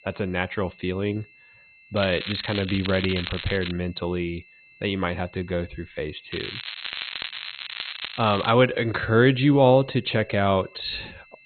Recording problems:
garbled, watery; badly; nothing above 4 kHz
crackling; loud; from 2 to 3.5 s and from 6.5 to 8.5 s; 9 dB below the speech
high-pitched whine; faint; throughout; 2.5 kHz, 25 dB below the speech

